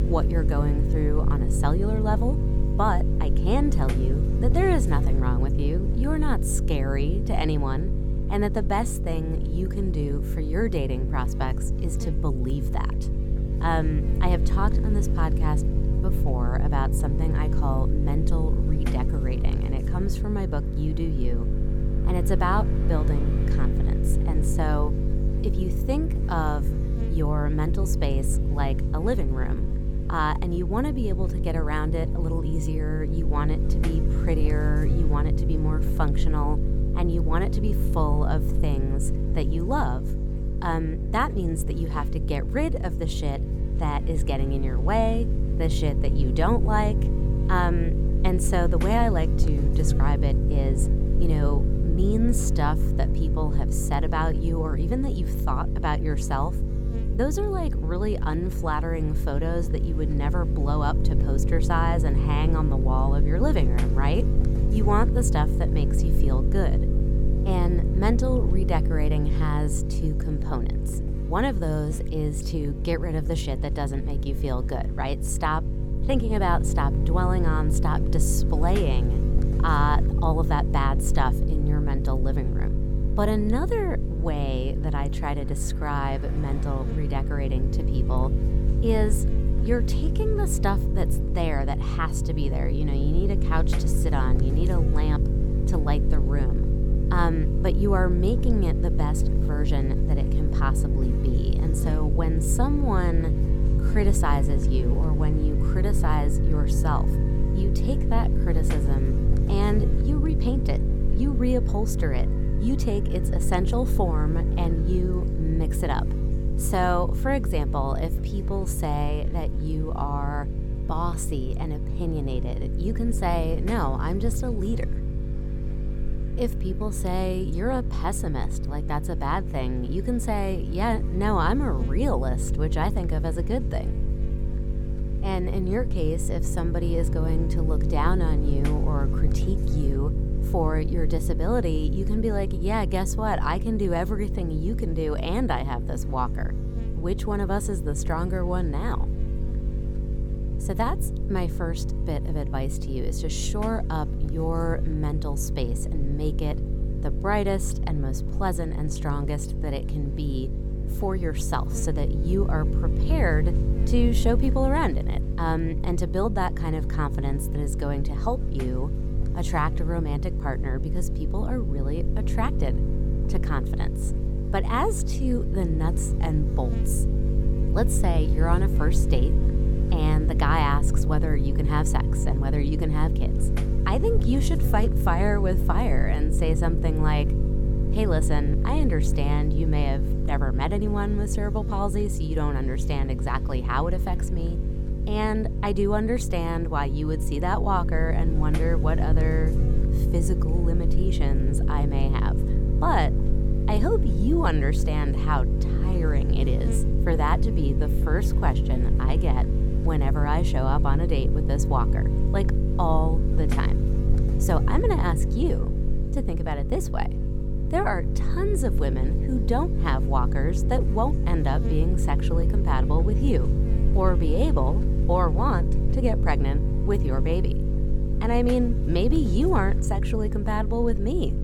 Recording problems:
electrical hum; loud; throughout; 50 Hz, 7 dB below the speech
traffic noise; faint; throughout; 30 dB below the speech

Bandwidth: 17.5 kHz